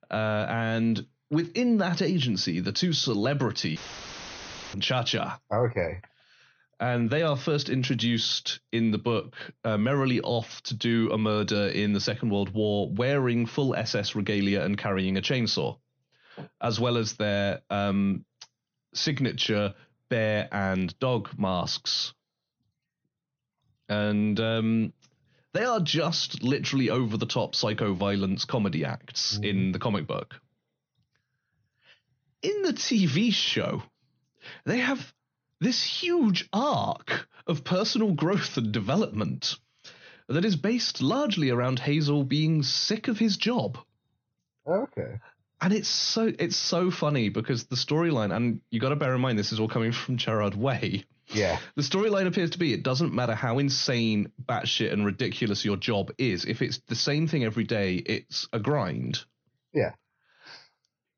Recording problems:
high frequencies cut off; noticeable; nothing above 6.5 kHz
audio cutting out; filled with static; at 4 s for 1 s

